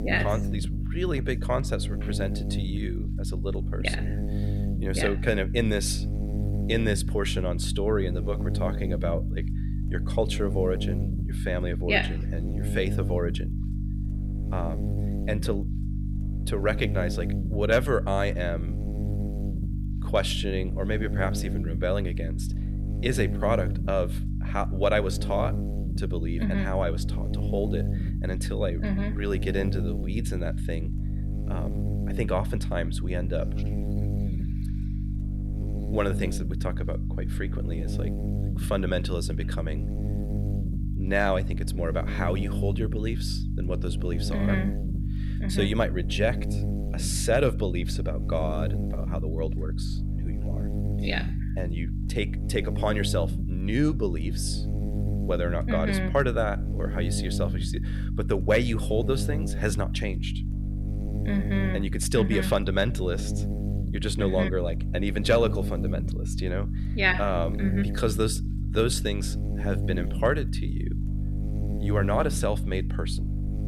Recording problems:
electrical hum; noticeable; throughout; 50 Hz, 10 dB below the speech

